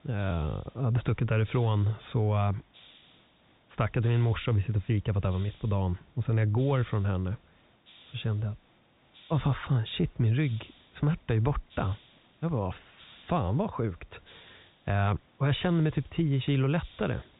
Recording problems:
high frequencies cut off; severe; nothing above 3.5 kHz
hiss; faint; throughout; 25 dB below the speech

